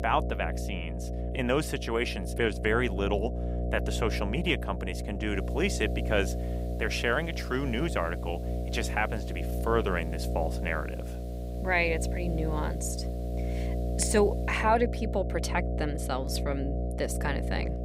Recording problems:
electrical hum; loud; throughout; 60 Hz, 10 dB below the speech
hiss; faint; from 5.5 to 15 s; 25 dB below the speech

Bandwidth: 15.5 kHz